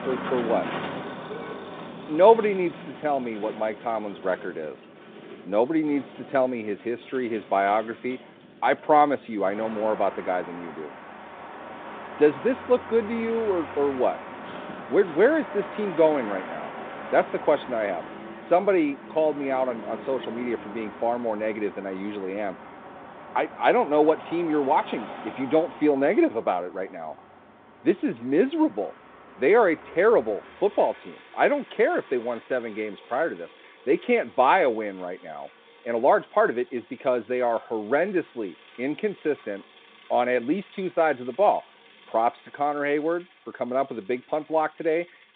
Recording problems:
phone-call audio; nothing above 3.5 kHz
traffic noise; noticeable; throughout; 15 dB below the speech

